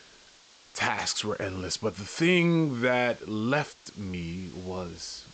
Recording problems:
high frequencies cut off; noticeable; nothing above 8 kHz
hiss; faint; throughout; 25 dB below the speech

